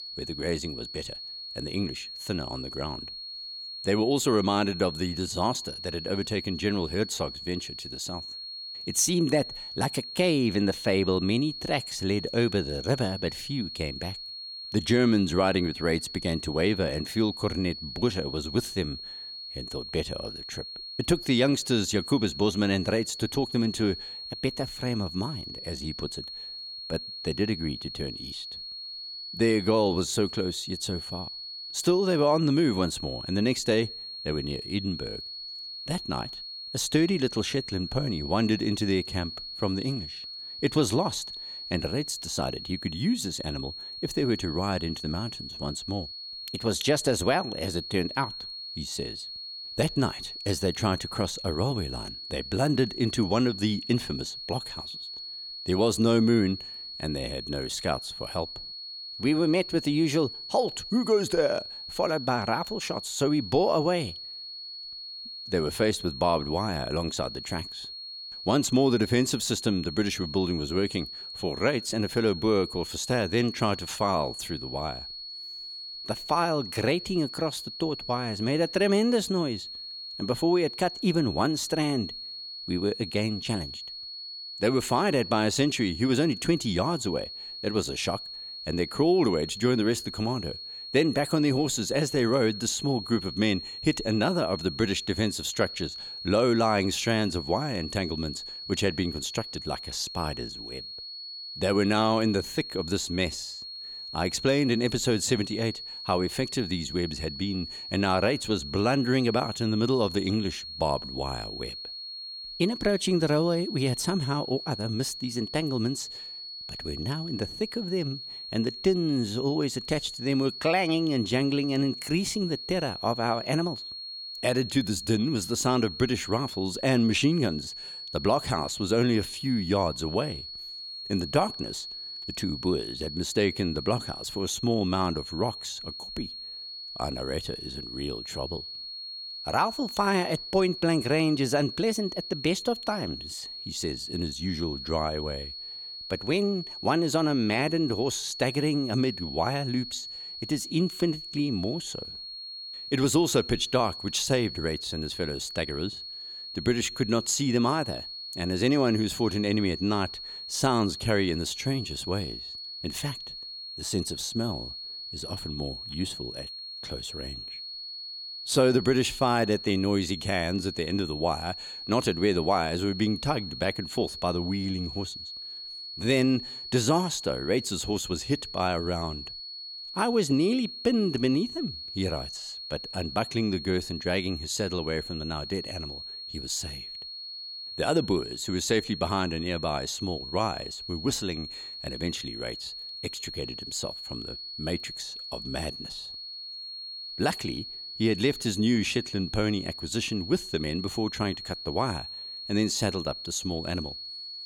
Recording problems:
high-pitched whine; loud; throughout; 4.5 kHz, 9 dB below the speech

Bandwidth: 17 kHz